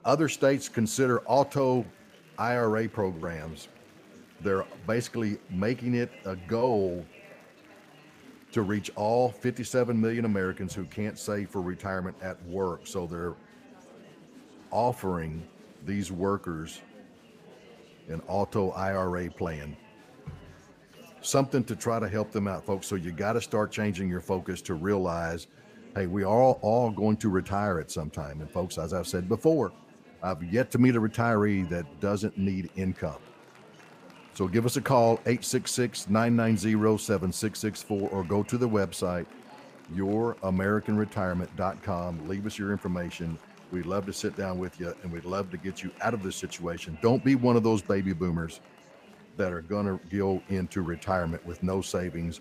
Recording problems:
murmuring crowd; faint; throughout; 25 dB below the speech

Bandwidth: 15 kHz